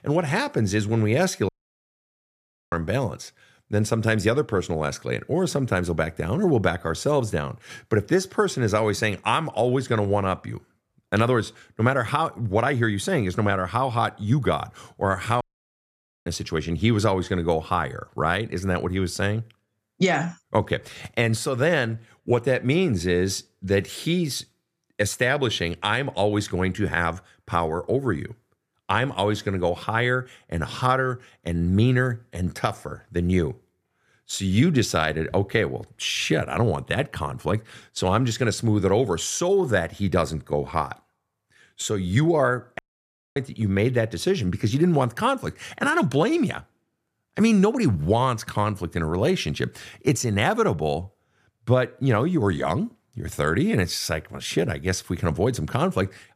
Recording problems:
audio cutting out; at 1.5 s for 1 s, at 15 s for 1 s and at 43 s for 0.5 s

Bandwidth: 14.5 kHz